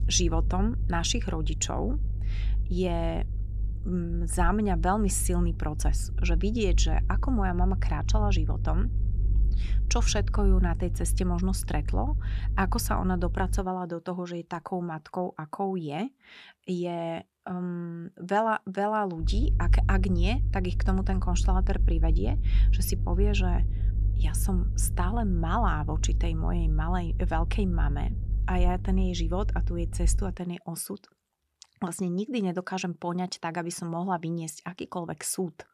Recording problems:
low rumble; noticeable; until 14 s and from 19 to 30 s; 15 dB below the speech

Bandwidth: 14 kHz